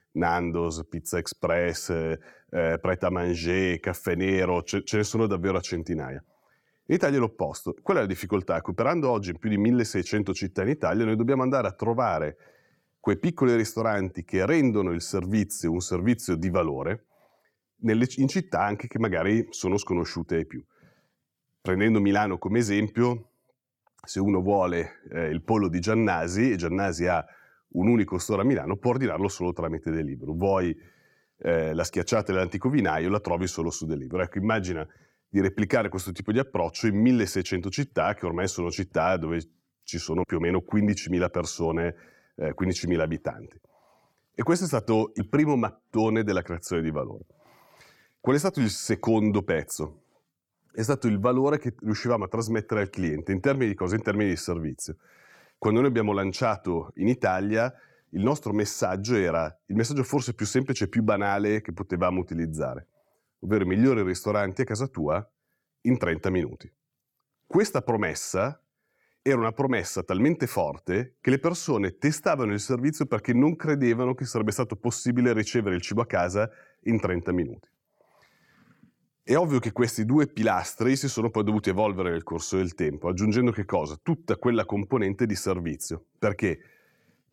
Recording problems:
none

